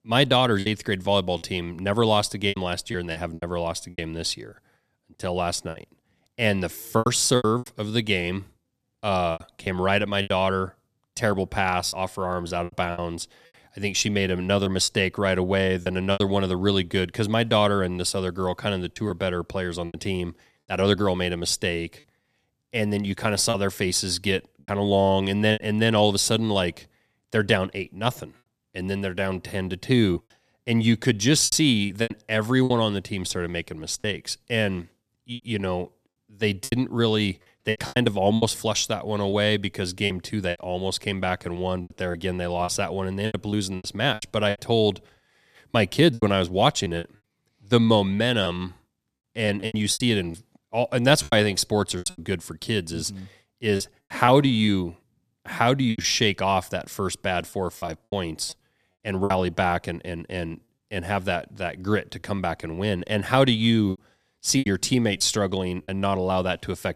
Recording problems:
choppy; very; 8% of the speech affected

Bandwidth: 14.5 kHz